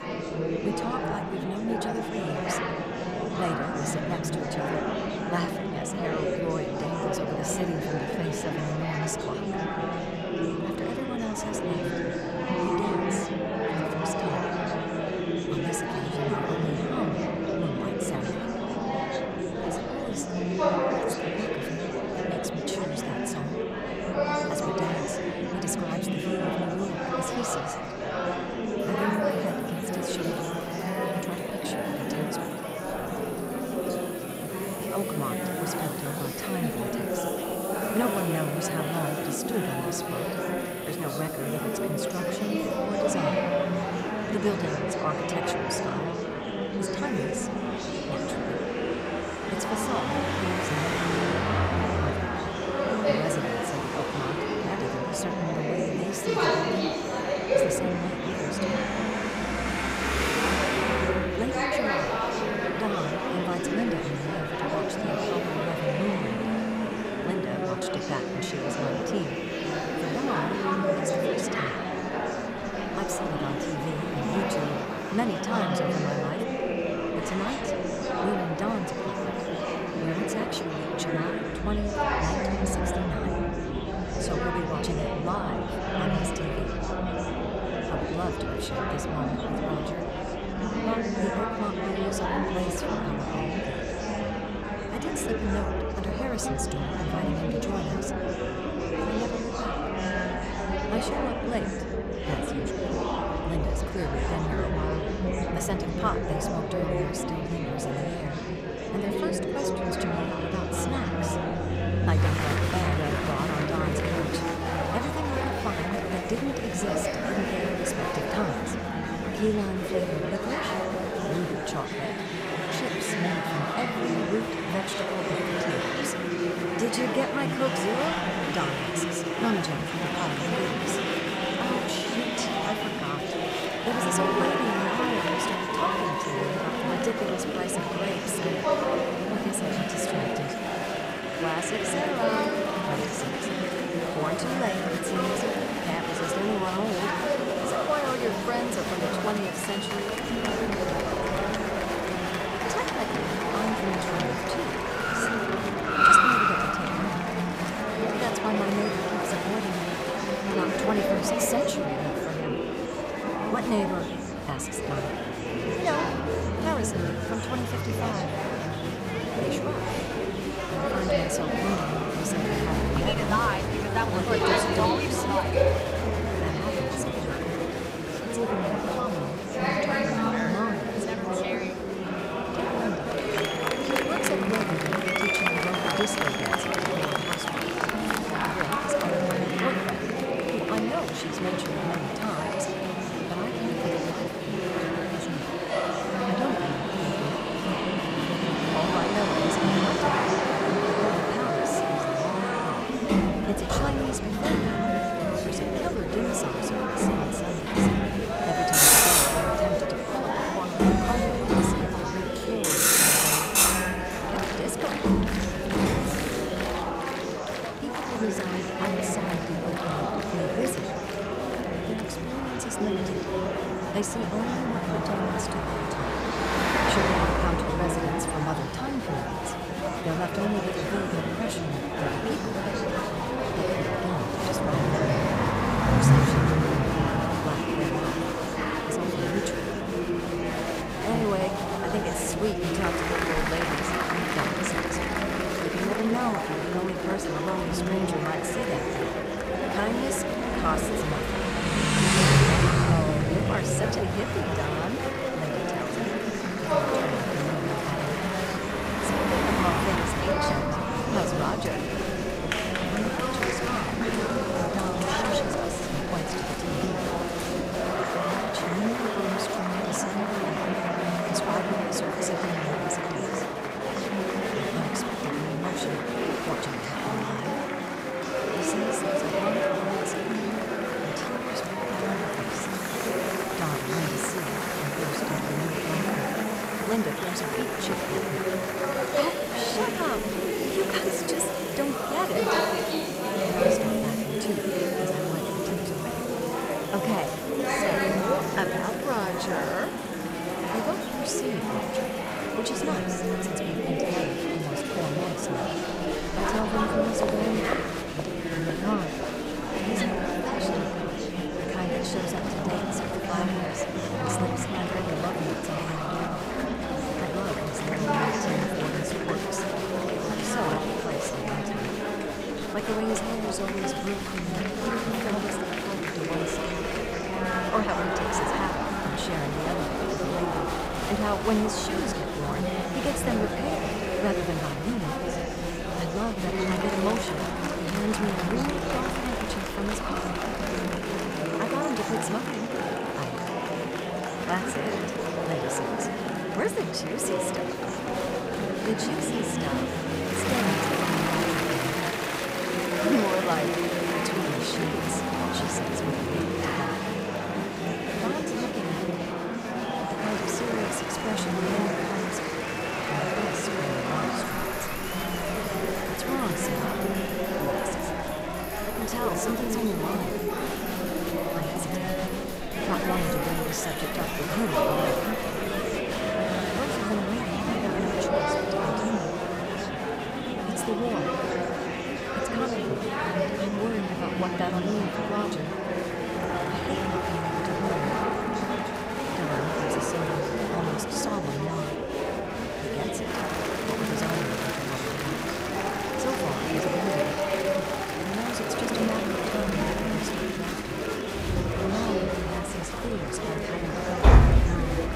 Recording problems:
traffic noise; very loud; throughout; 1 dB above the speech
murmuring crowd; very loud; throughout; 4 dB above the speech

